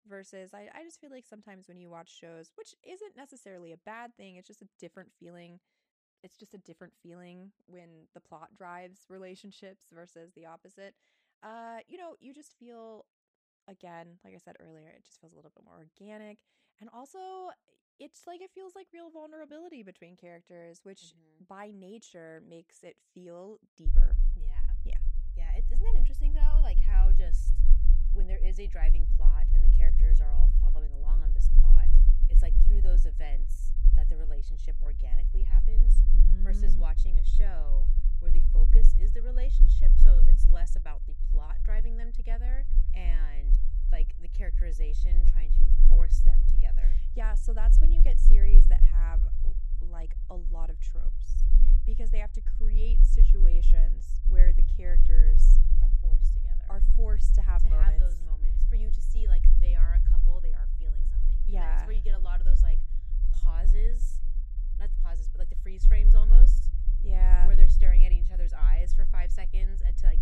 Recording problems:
low rumble; loud; from 24 s on; 5 dB below the speech

